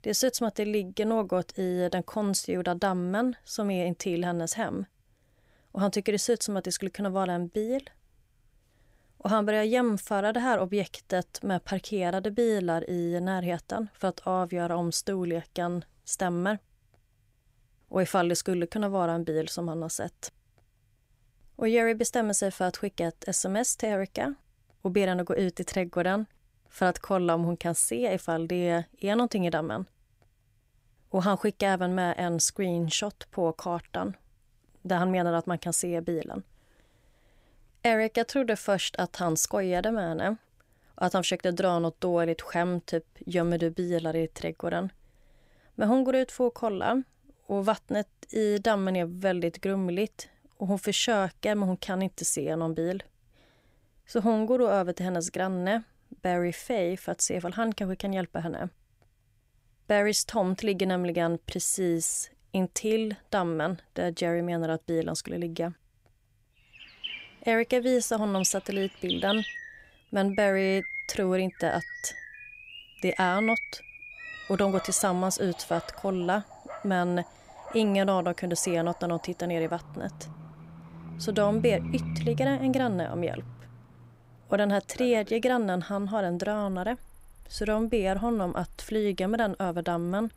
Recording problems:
animal sounds; noticeable; from 1:07 on; 10 dB below the speech

